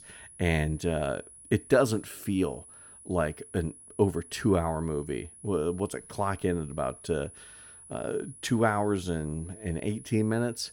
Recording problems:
high-pitched whine; noticeable; throughout; 10.5 kHz, 20 dB below the speech

